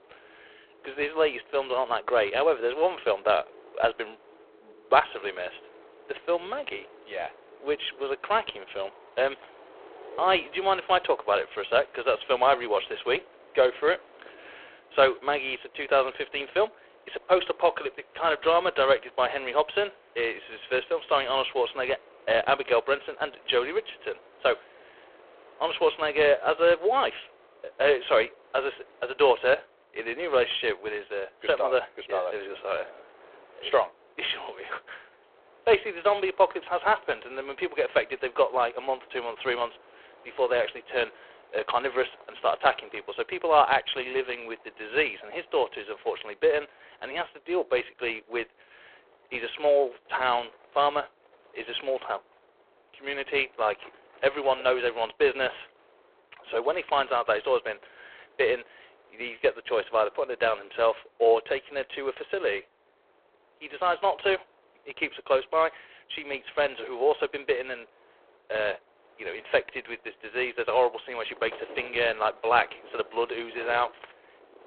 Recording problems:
phone-call audio; poor line
wind in the background; faint; throughout; 25 dB below the speech

